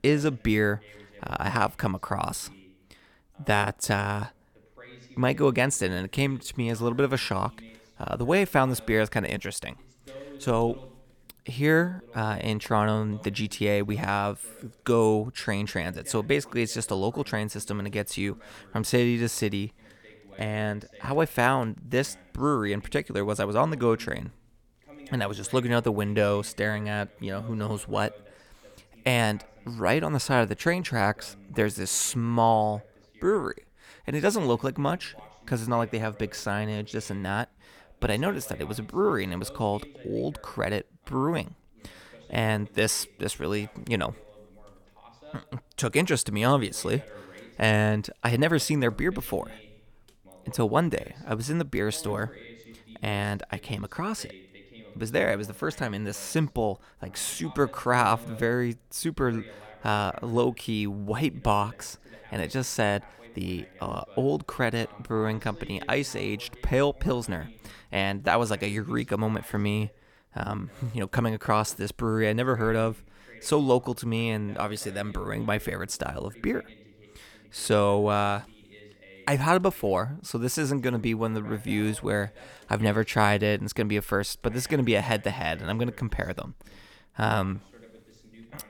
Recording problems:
voice in the background; faint; throughout; 25 dB below the speech

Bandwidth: 18.5 kHz